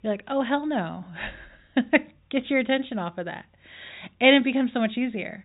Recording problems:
high frequencies cut off; severe; nothing above 4 kHz

